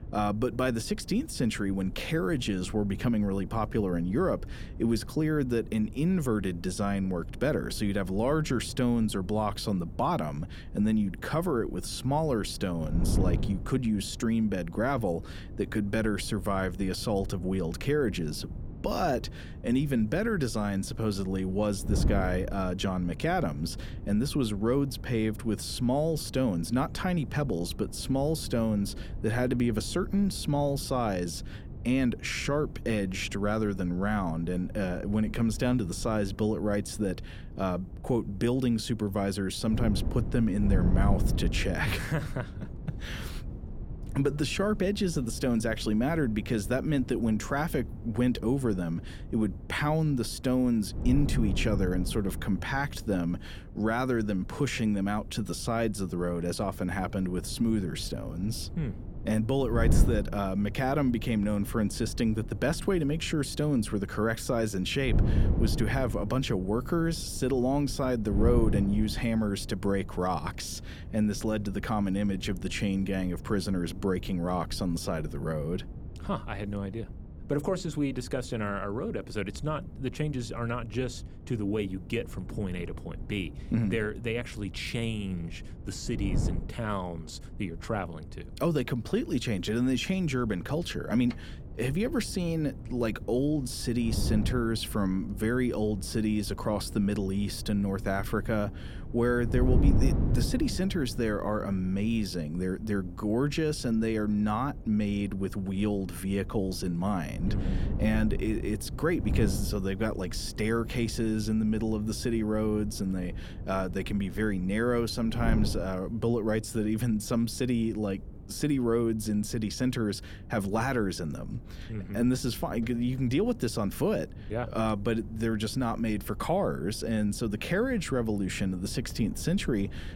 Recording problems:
wind noise on the microphone; occasional gusts; 15 dB below the speech

